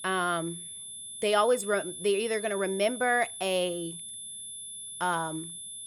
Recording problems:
high-pitched whine; loud; throughout; 10.5 kHz, 10 dB below the speech

